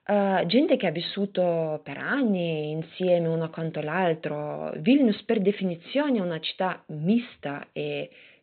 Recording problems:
high frequencies cut off; severe; nothing above 4 kHz

